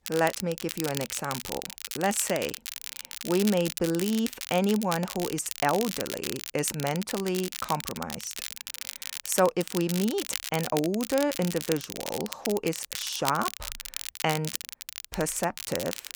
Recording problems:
crackle, like an old record; loud; 7 dB below the speech

